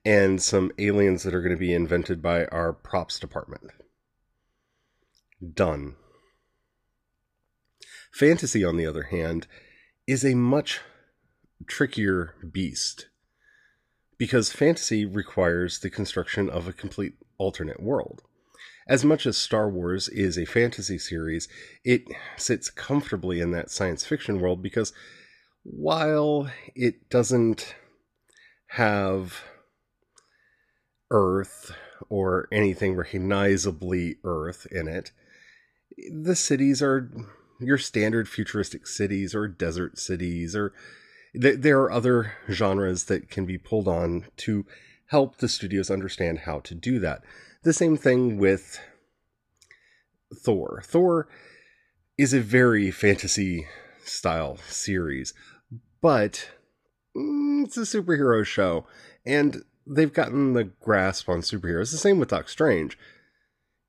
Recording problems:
none

